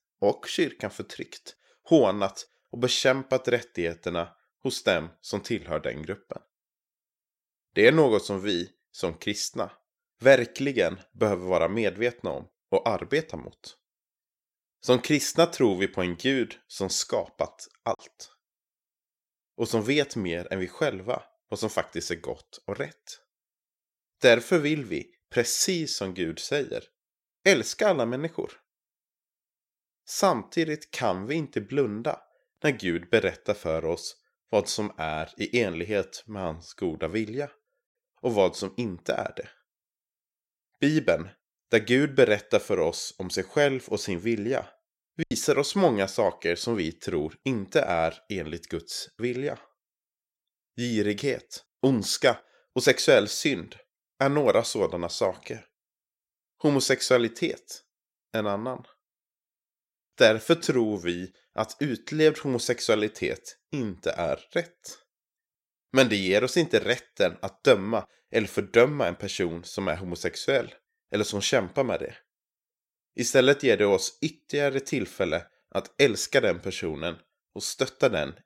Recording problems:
choppy; occasionally; at 18 s and at 45 s; 2% of the speech affected

